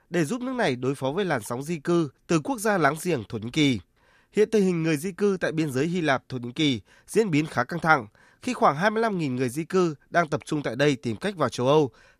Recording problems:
none

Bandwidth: 14.5 kHz